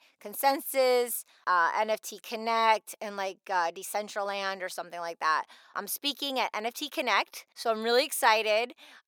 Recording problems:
thin; somewhat; fading below 550 Hz

